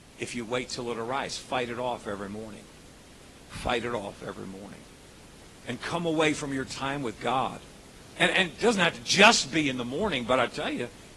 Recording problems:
garbled, watery; slightly; nothing above 11 kHz
hiss; faint; throughout; 25 dB below the speech

